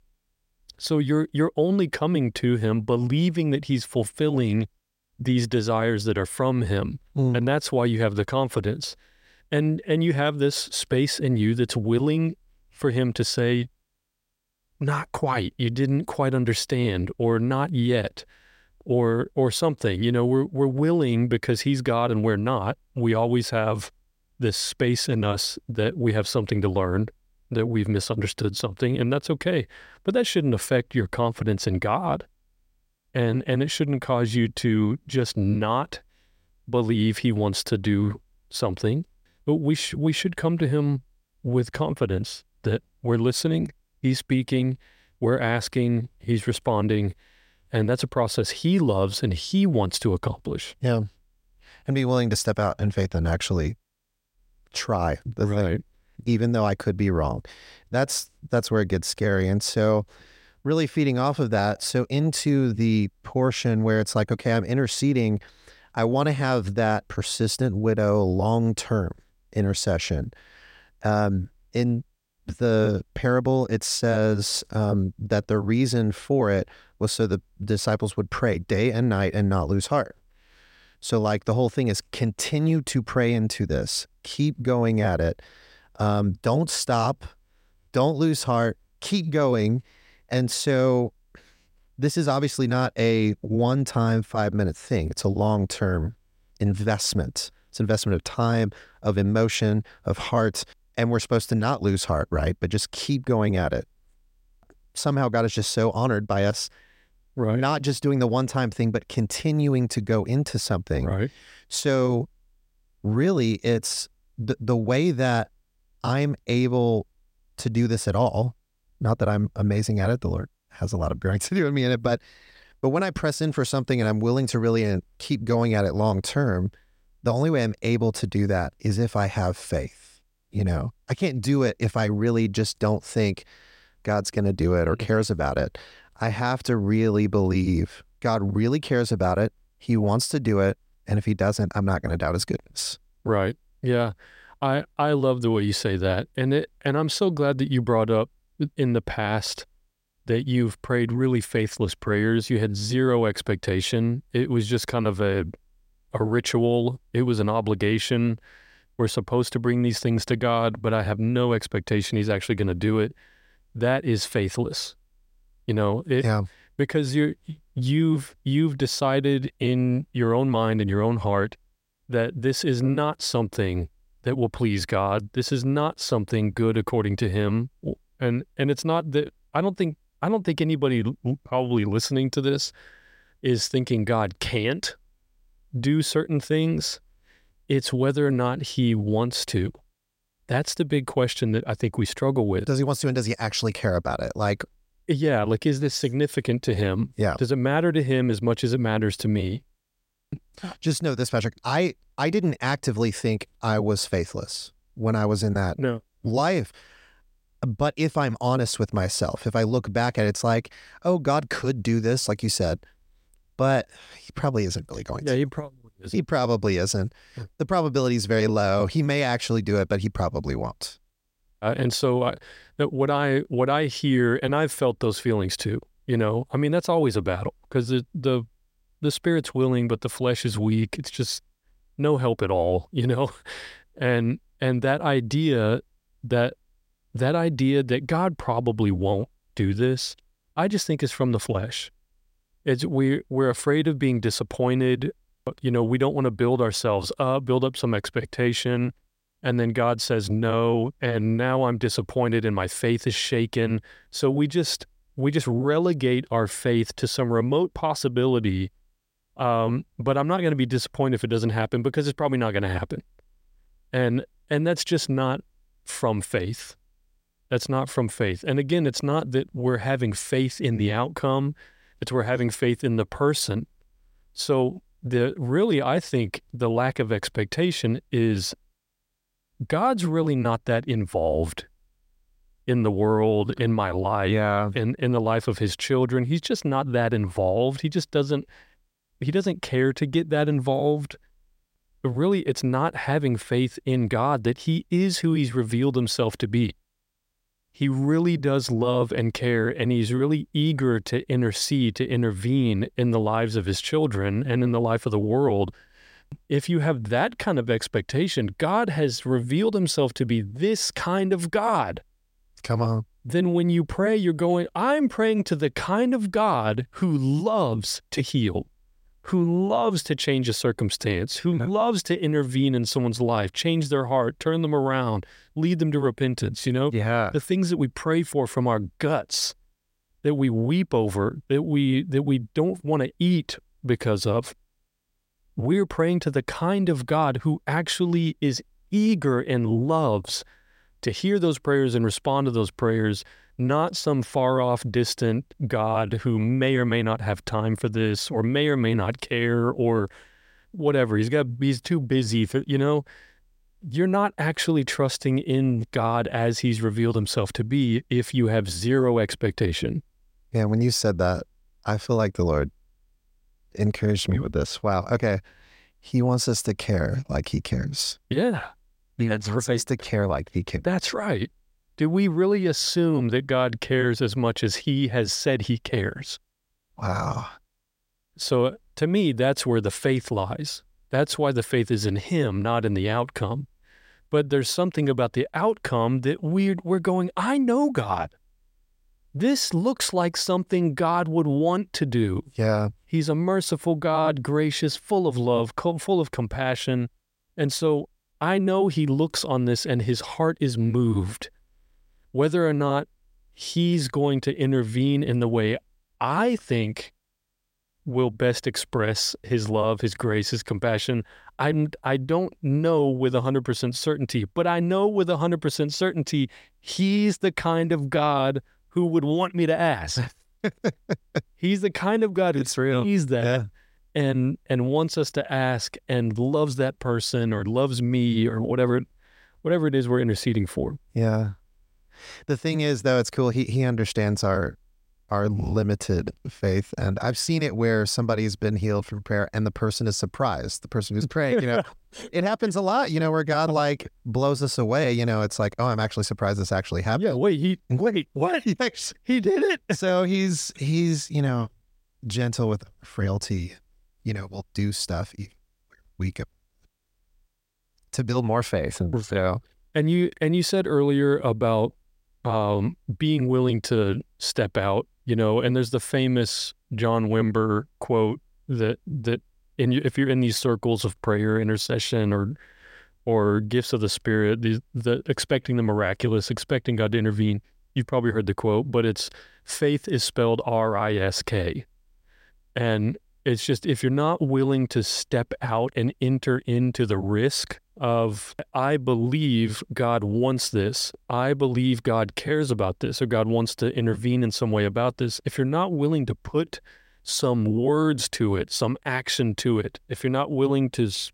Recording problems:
none

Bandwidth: 16 kHz